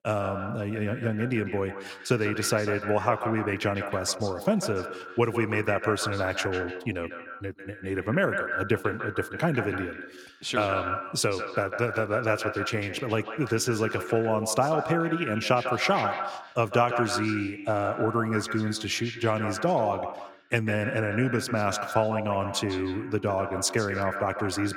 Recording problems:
echo of what is said; strong; throughout; 150 ms later, 7 dB below the speech

